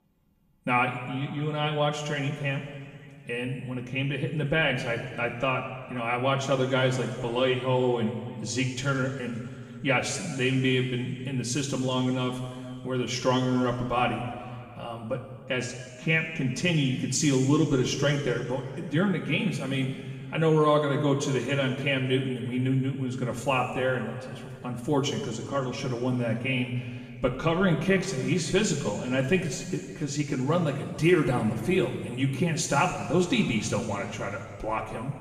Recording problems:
off-mic speech; far
room echo; noticeable; dies away in 2 s

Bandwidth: 15 kHz